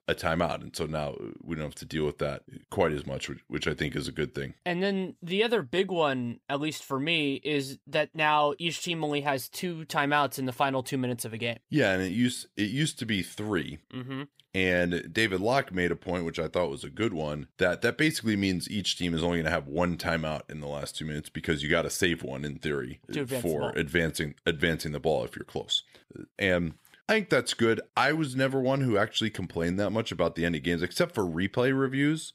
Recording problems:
none

